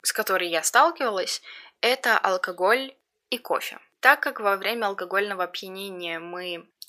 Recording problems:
thin; very; fading below 800 Hz

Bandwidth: 15 kHz